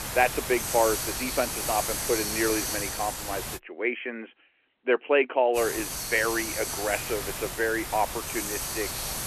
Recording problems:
phone-call audio
hiss; loud; until 3.5 s and from 5.5 s on; 2 dB below the speech

